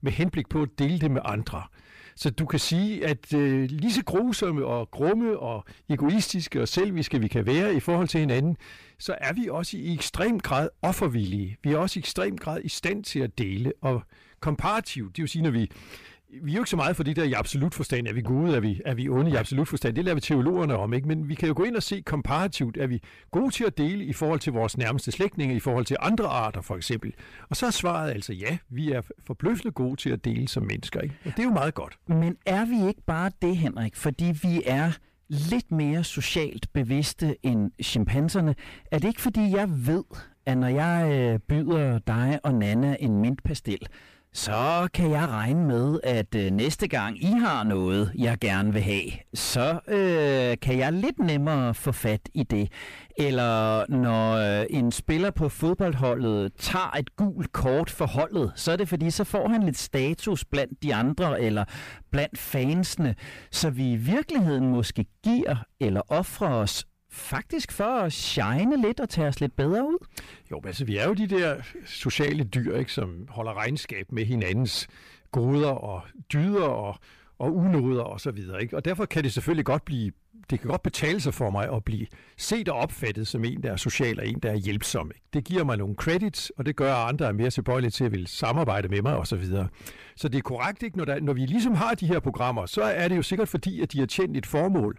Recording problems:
distortion; slight; 9 dB below the speech

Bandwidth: 15 kHz